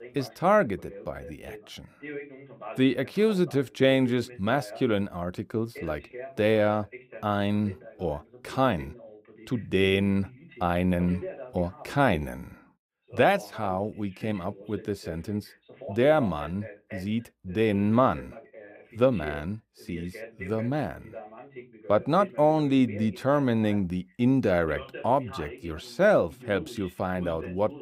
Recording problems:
voice in the background; noticeable; throughout; 15 dB below the speech

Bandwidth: 15.5 kHz